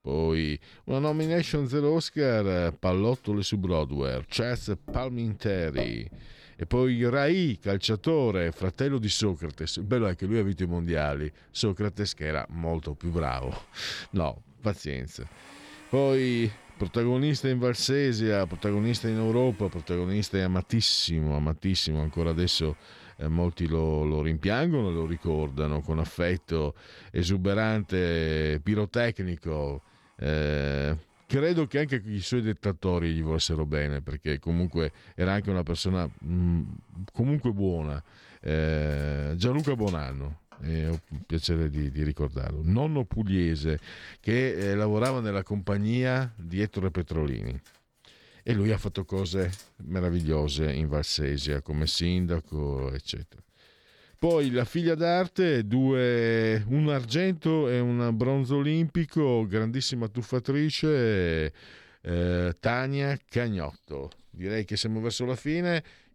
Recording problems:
household noises; faint; throughout; 25 dB below the speech

